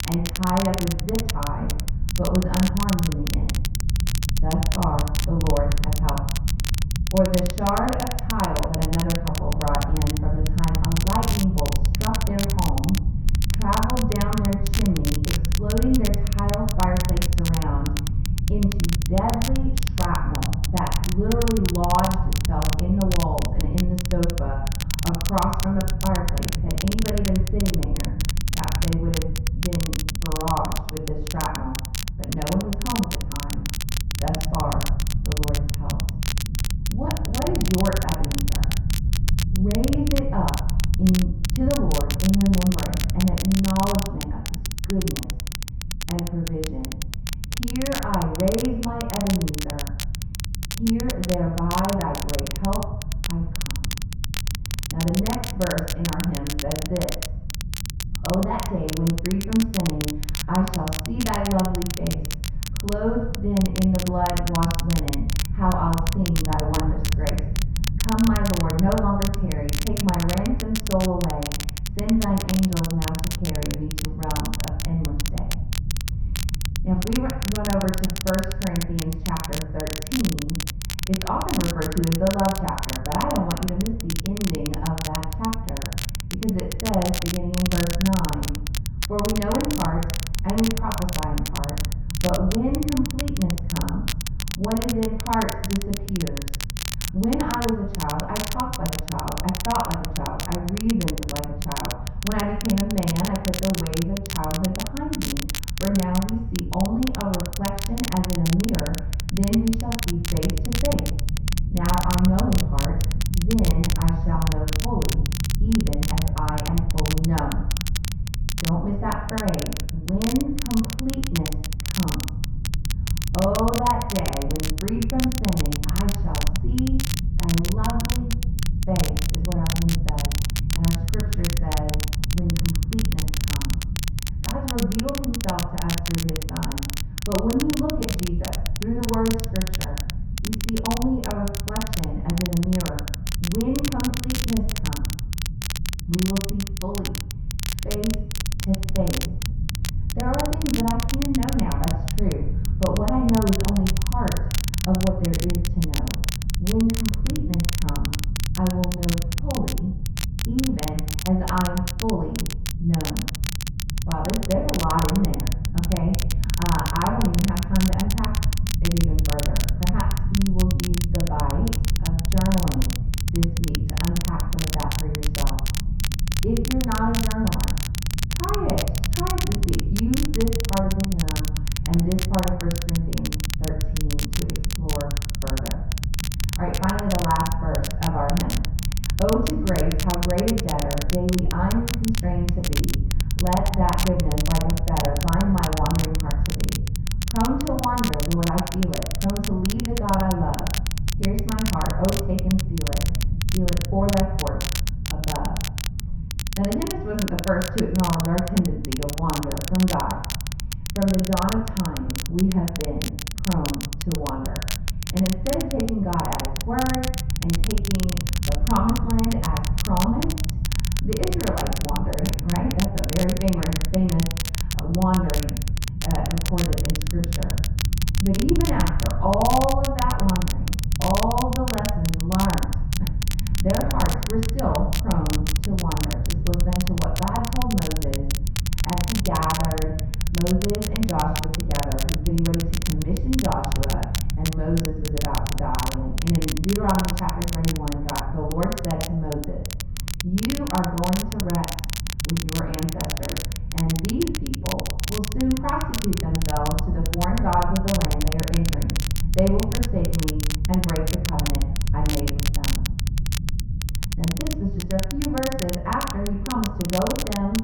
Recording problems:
off-mic speech; far
muffled; very; fading above 2 kHz
room echo; noticeable; dies away in 0.7 s
crackle, like an old record; loud; 6 dB below the speech
low rumble; noticeable; throughout; 15 dB below the speech

